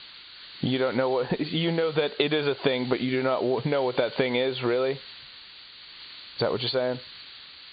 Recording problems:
high frequencies cut off; severe; nothing above 4.5 kHz
squashed, flat; heavily
hiss; noticeable; throughout; 15 dB below the speech

